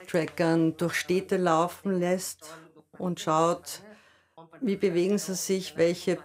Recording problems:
voice in the background; faint; throughout; 25 dB below the speech

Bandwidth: 15.5 kHz